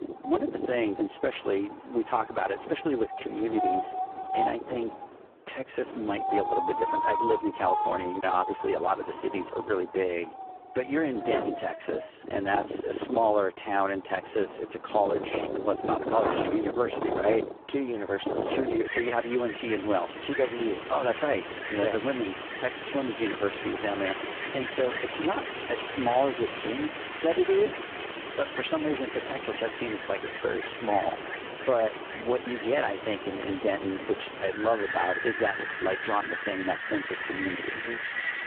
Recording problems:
phone-call audio; poor line
wind in the background; loud; throughout; 5 dB below the speech

